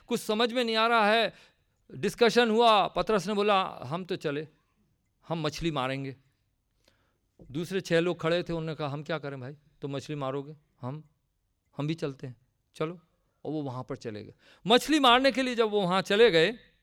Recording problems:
none

